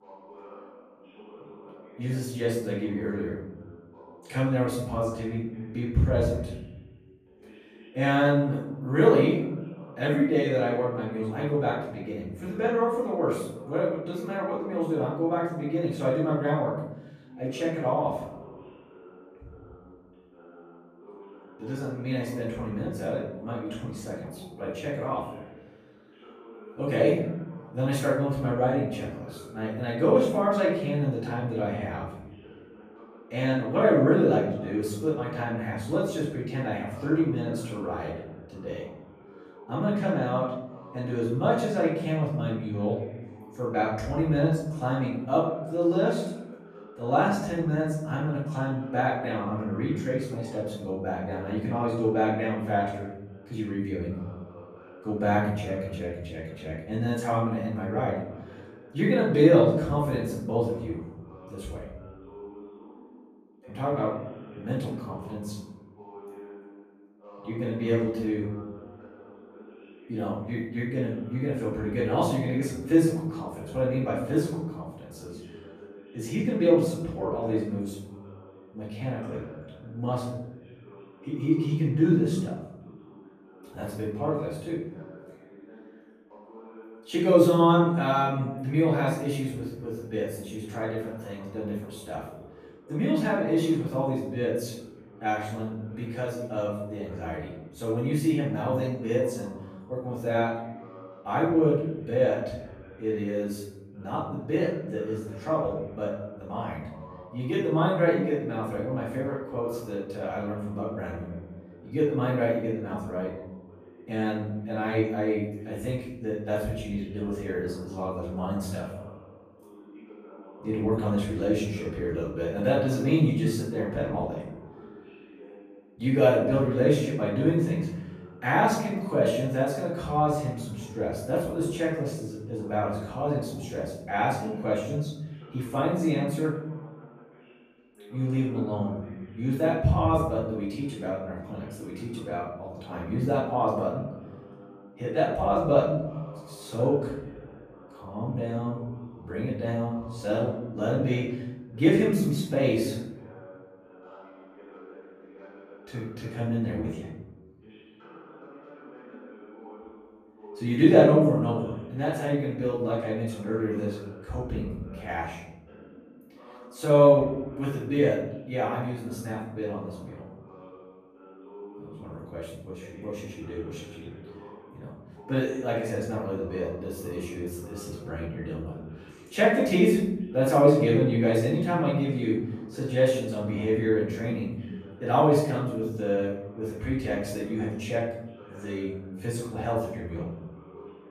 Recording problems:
off-mic speech; far
room echo; noticeable; dies away in 1 s
voice in the background; faint; throughout; 20 dB below the speech

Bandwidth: 14.5 kHz